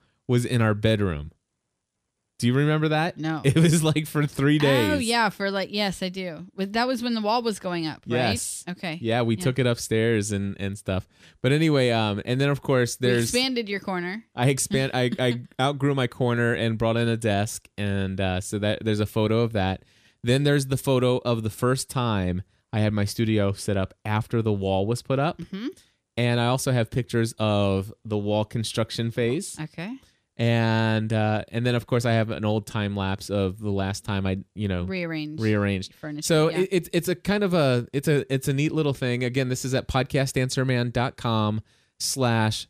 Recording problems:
none

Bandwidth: 14.5 kHz